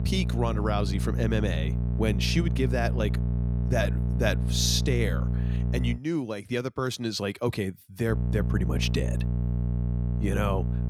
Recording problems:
electrical hum; loud; until 6 s and from 8 s on; 60 Hz, 9 dB below the speech

